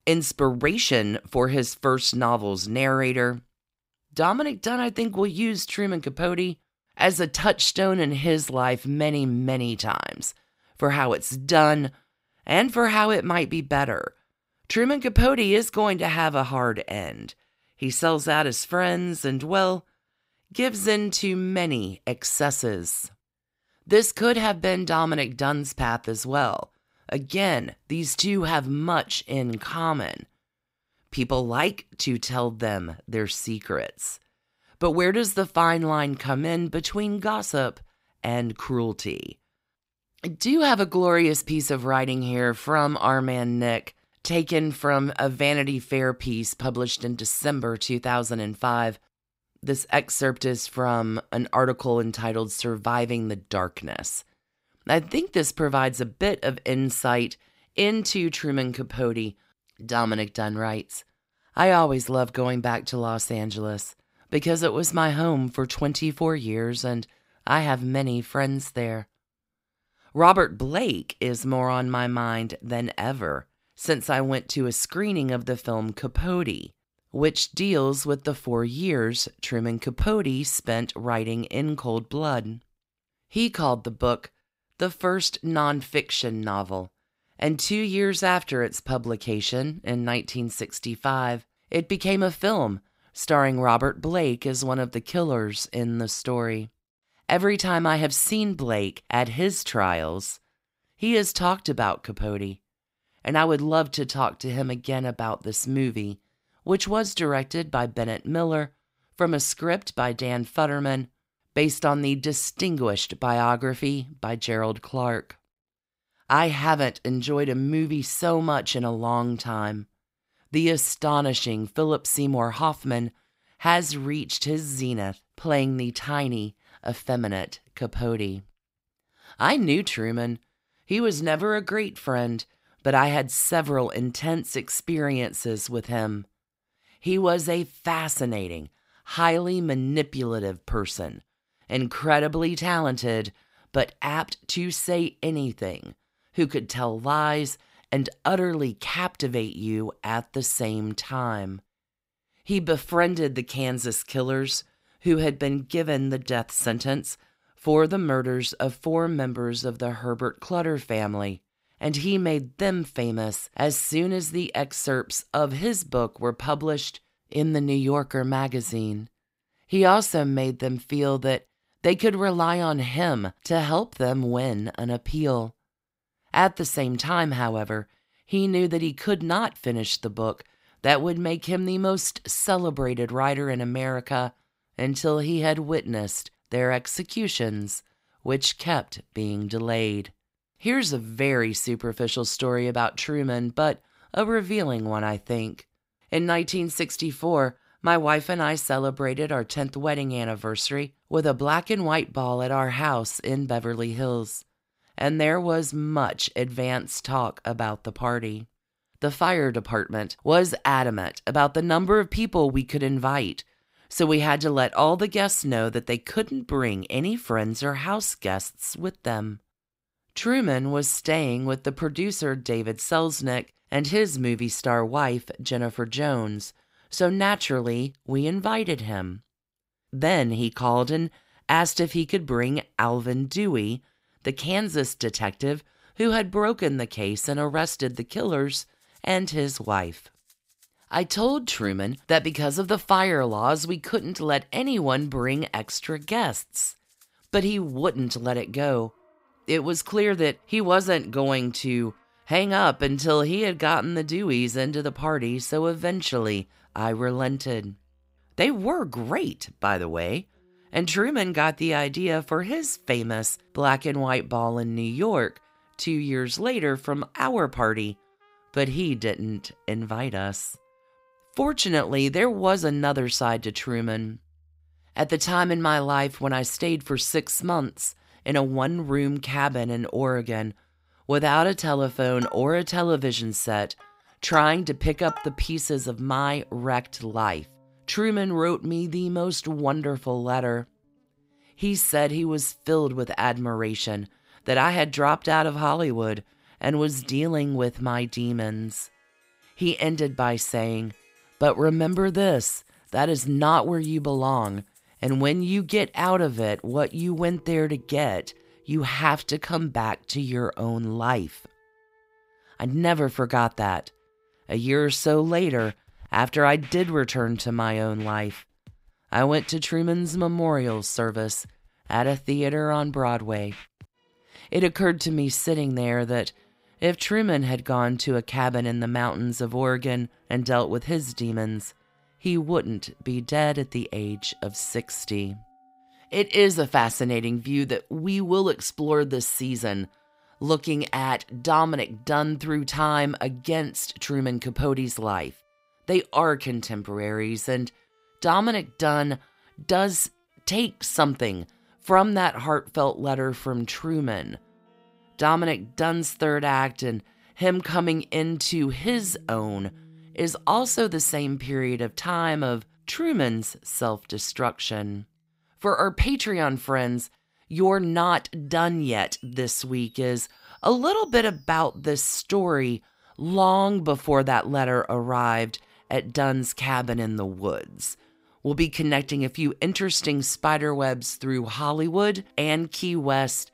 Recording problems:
background music; faint; from 3:57 on; 25 dB below the speech

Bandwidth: 15.5 kHz